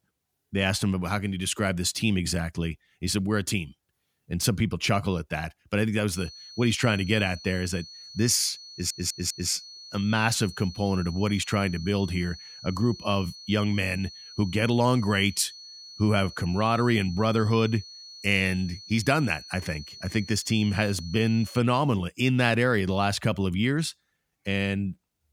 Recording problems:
high-pitched whine; noticeable; from 6 to 22 s; 4.5 kHz, 15 dB below the speech
audio stuttering; at 8.5 s

